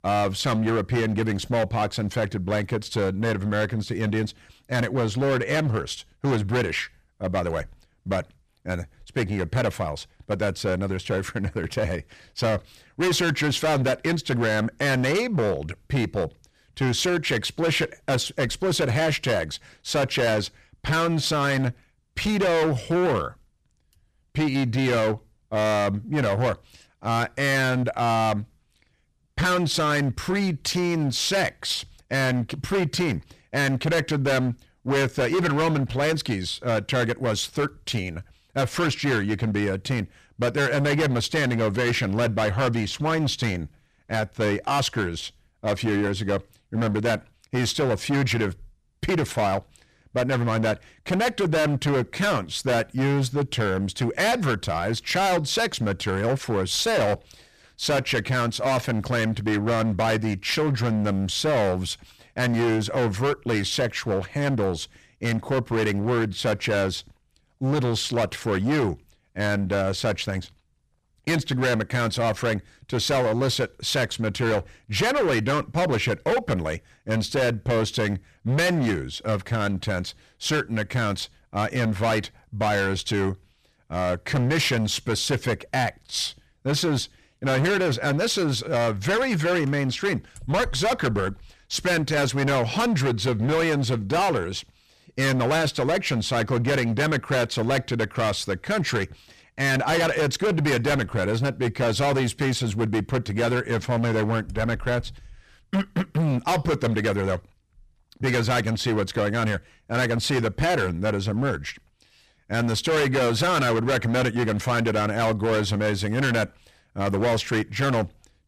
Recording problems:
distortion; heavy; 18% of the sound clipped

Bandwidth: 14.5 kHz